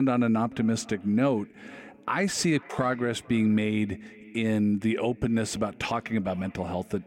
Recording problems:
echo of what is said; faint; throughout; 440 ms later, 20 dB below the speech
abrupt cut into speech; at the start

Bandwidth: 16 kHz